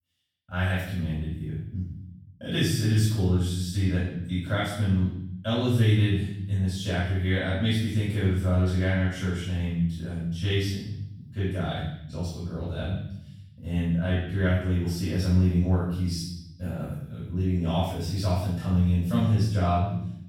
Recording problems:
room echo; strong; dies away in 0.8 s
off-mic speech; far

